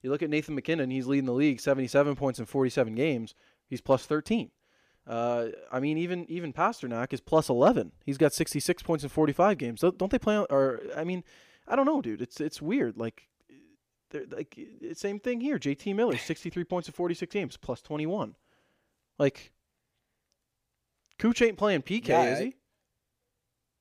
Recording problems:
none

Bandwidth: 15 kHz